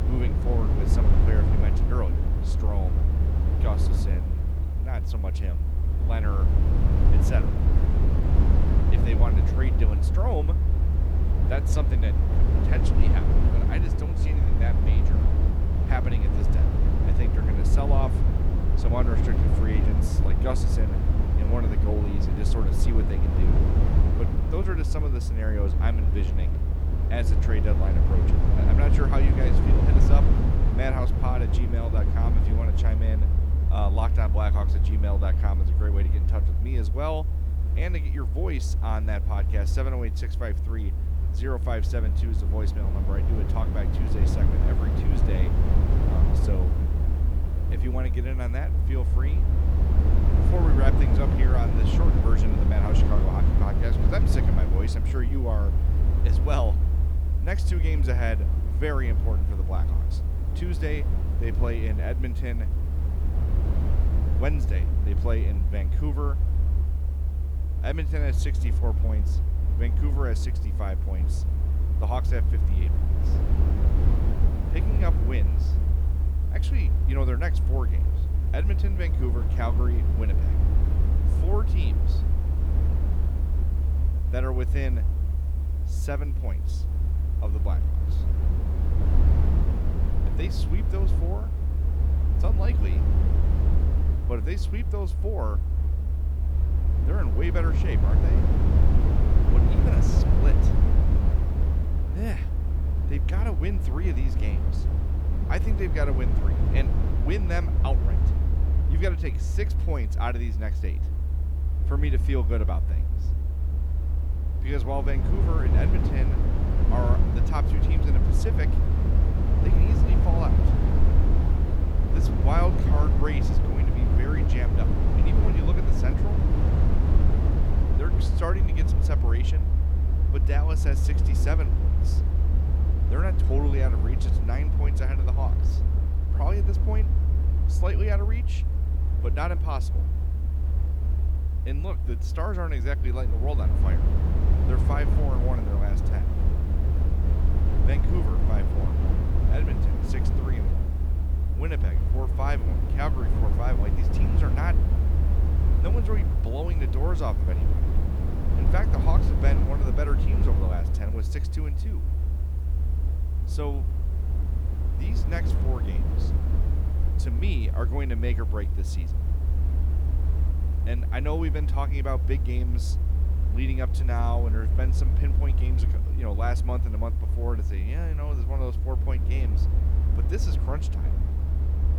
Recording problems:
low rumble; loud; throughout; 3 dB below the speech
hiss; faint; throughout; 25 dB below the speech

